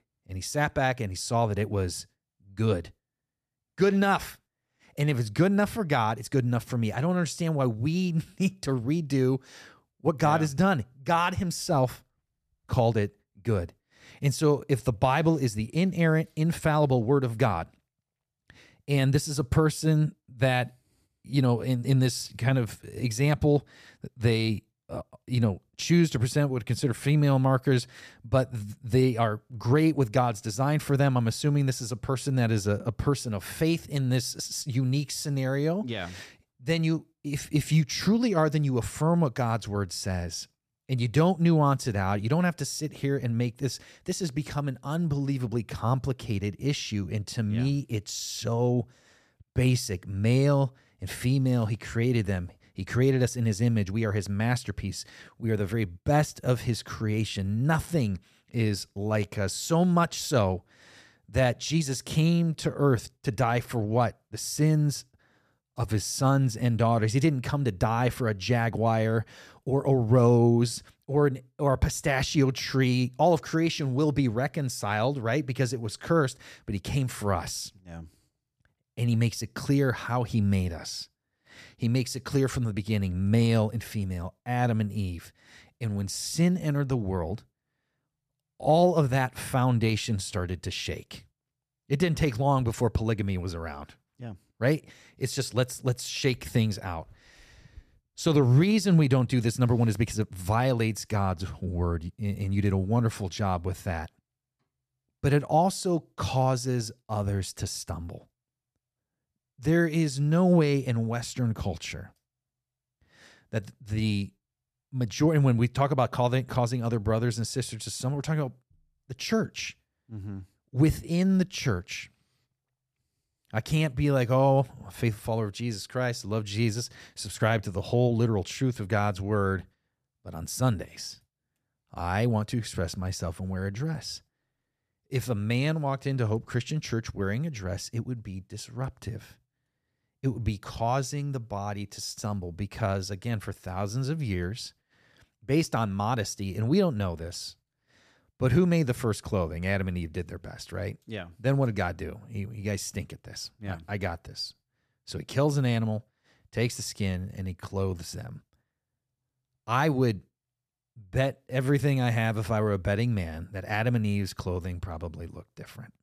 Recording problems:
none

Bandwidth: 14.5 kHz